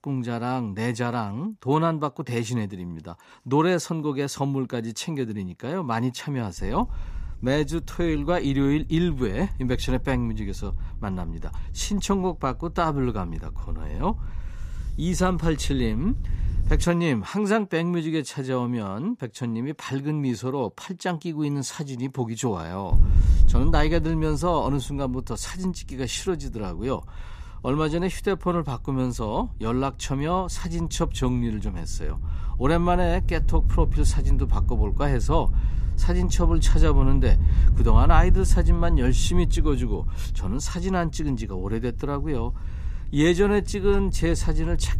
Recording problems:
wind noise on the microphone; occasional gusts; from 6.5 to 17 s and from 23 s on; 20 dB below the speech

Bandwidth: 14.5 kHz